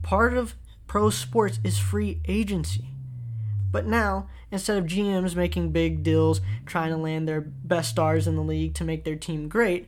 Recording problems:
low rumble; noticeable; throughout; 20 dB below the speech

